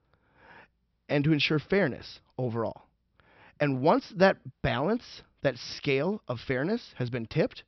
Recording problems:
high frequencies cut off; noticeable; nothing above 5.5 kHz

